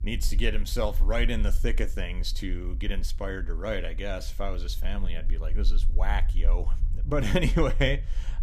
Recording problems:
low rumble; faint; throughout; 20 dB below the speech

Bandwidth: 15 kHz